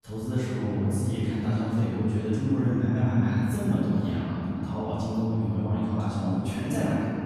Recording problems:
room echo; strong; dies away in 3 s
off-mic speech; far

